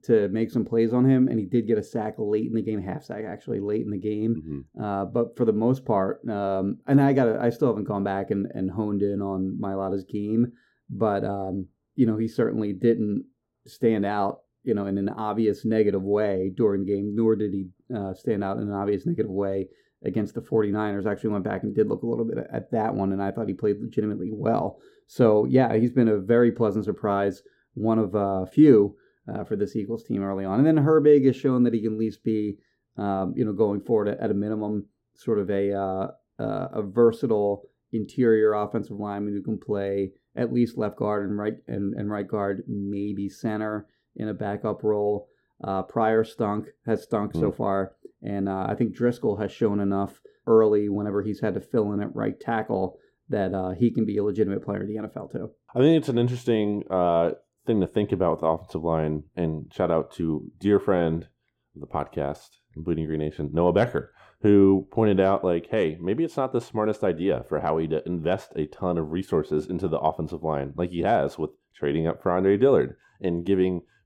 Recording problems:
muffled; slightly; fading above 1 kHz

